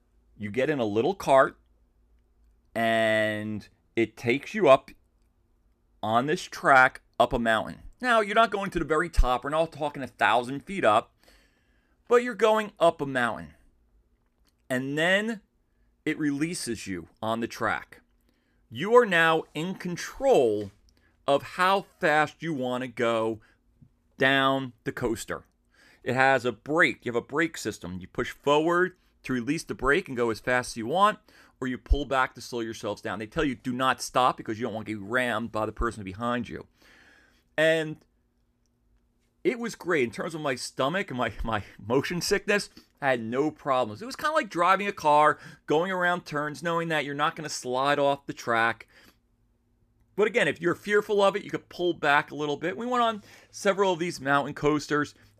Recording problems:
none

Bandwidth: 14.5 kHz